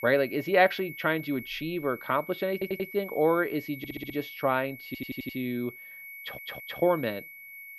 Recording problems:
muffled; slightly; fading above 3.5 kHz
high-pitched whine; noticeable; throughout; 2 kHz, 15 dB below the speech
audio stuttering; 4 times, first at 2.5 s

